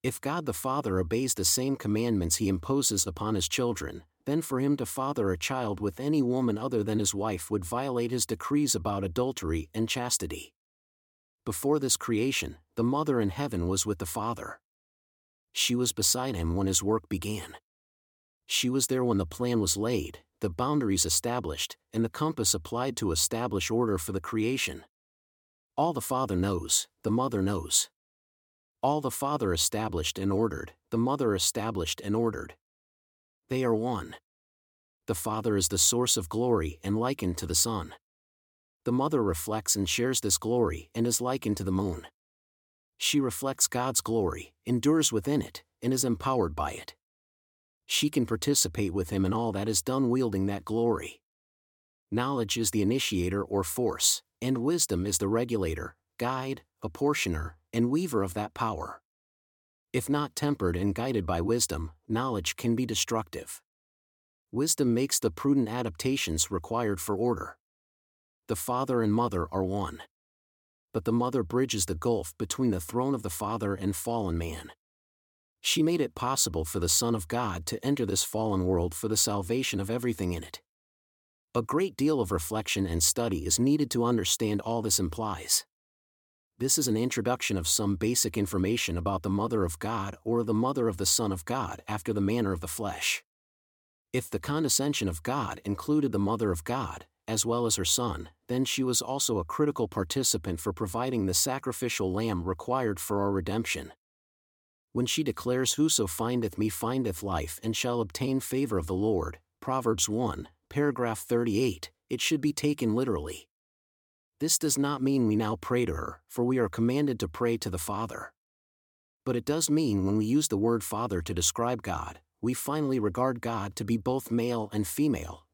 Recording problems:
none

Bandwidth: 17 kHz